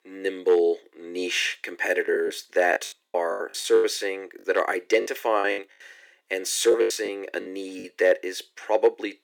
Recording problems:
thin; very; fading below 350 Hz
choppy; very; from 2 to 5.5 s and from 6.5 to 8 s; 17% of the speech affected

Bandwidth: 18 kHz